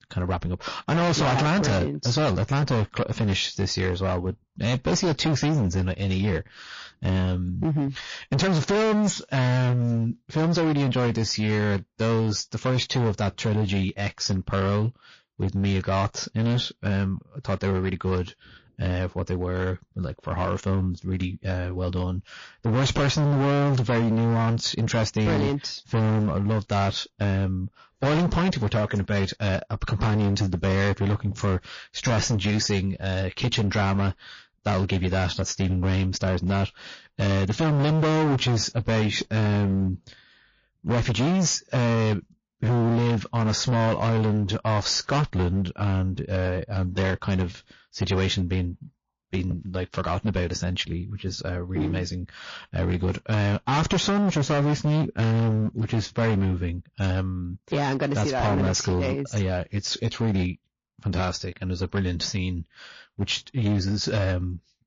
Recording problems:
distortion; heavy; 20% of the sound clipped
garbled, watery; slightly; nothing above 6.5 kHz

